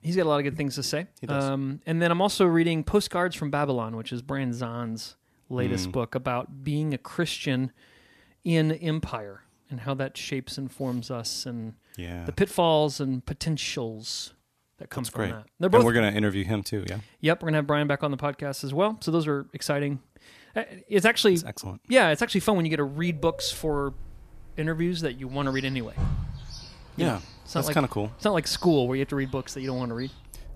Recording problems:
animal sounds; noticeable; from 23 s on; 15 dB below the speech

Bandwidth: 14.5 kHz